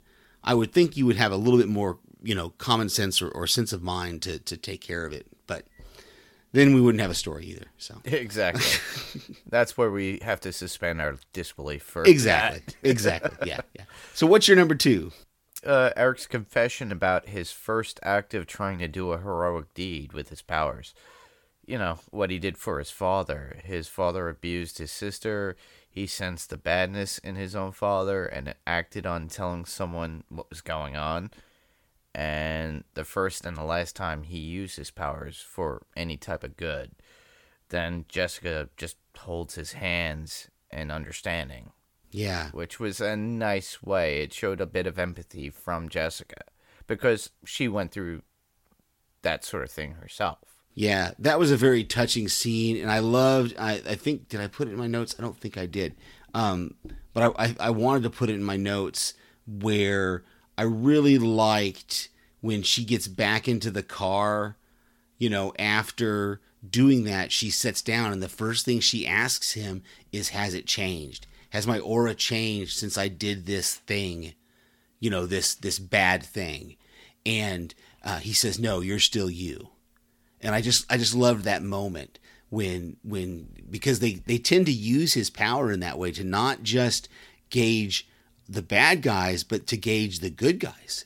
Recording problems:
none

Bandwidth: 17 kHz